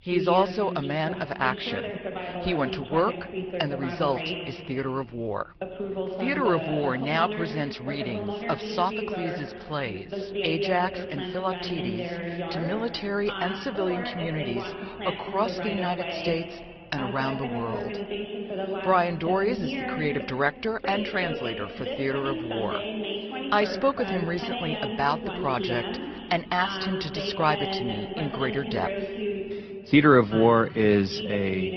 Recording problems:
high frequencies cut off; noticeable; nothing above 5.5 kHz
garbled, watery; slightly
voice in the background; loud; throughout; 5 dB below the speech

